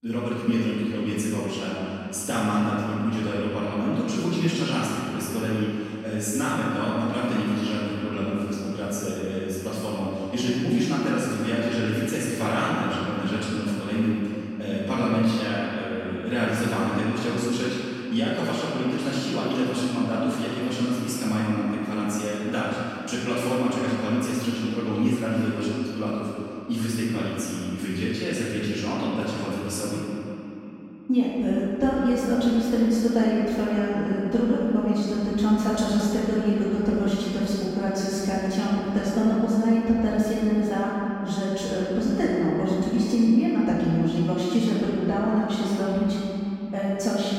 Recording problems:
room echo; strong; dies away in 2.8 s
off-mic speech; far
echo of what is said; faint; throughout; 360 ms later, 20 dB below the speech

